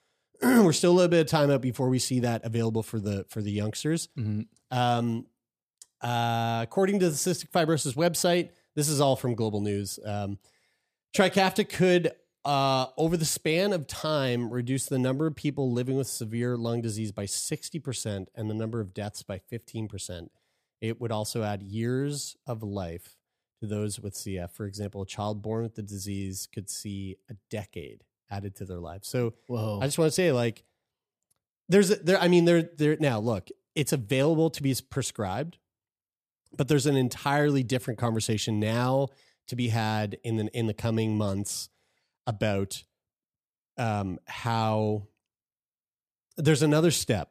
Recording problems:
none

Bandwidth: 14.5 kHz